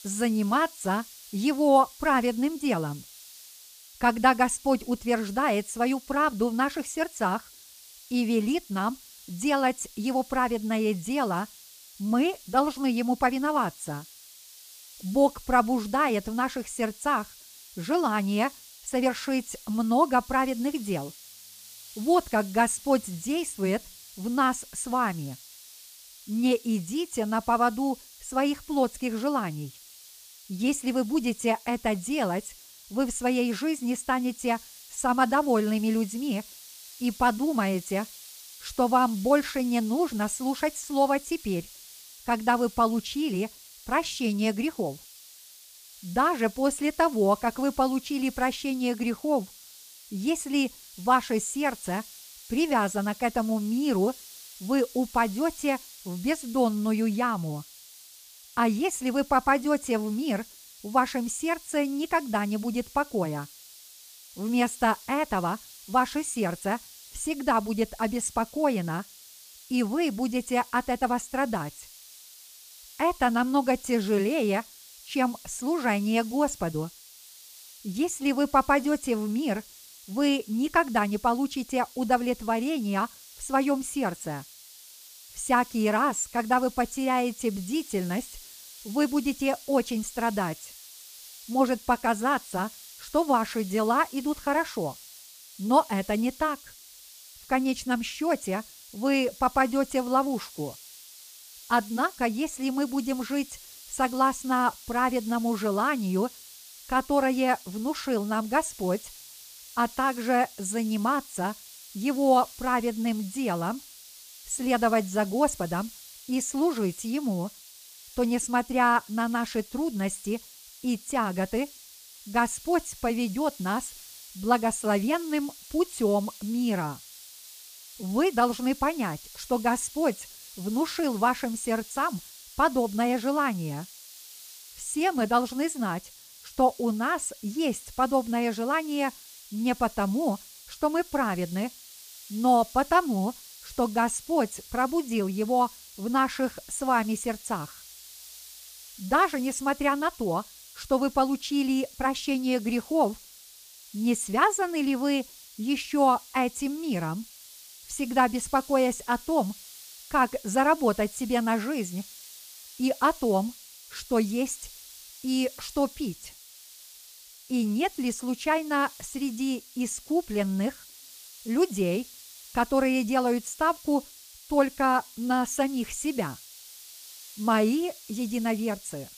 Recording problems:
hiss; noticeable; throughout; 20 dB below the speech

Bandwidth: 15 kHz